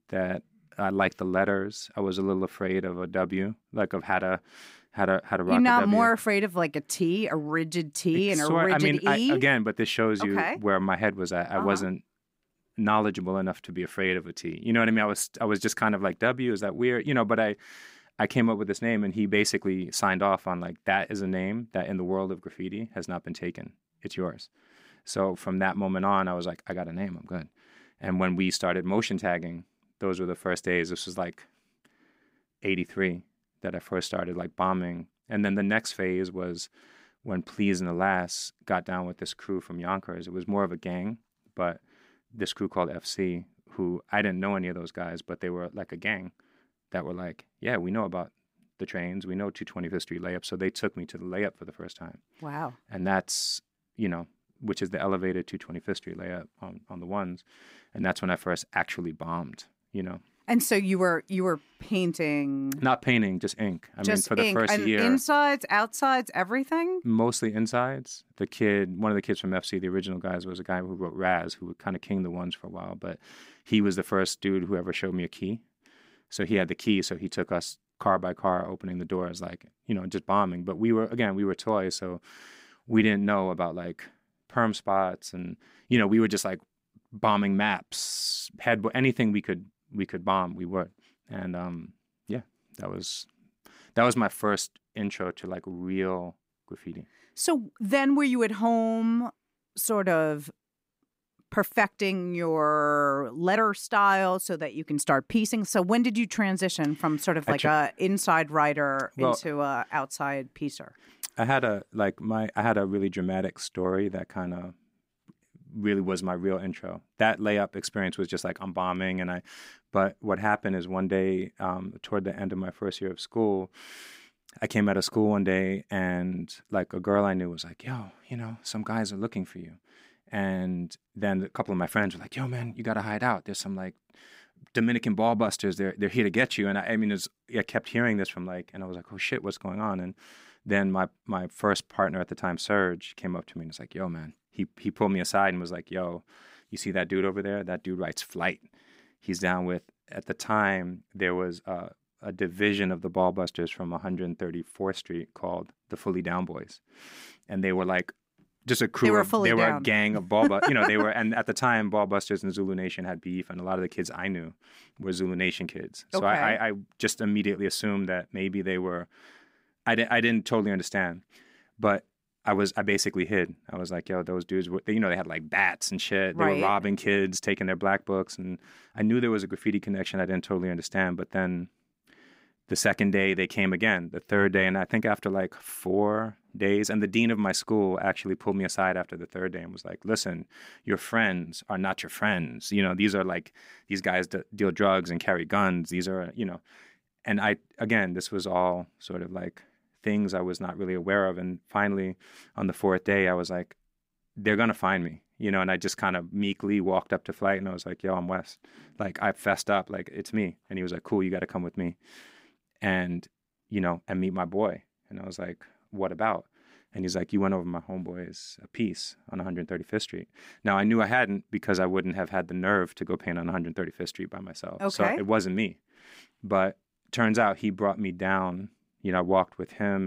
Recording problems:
abrupt cut into speech; at the end

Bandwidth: 15.5 kHz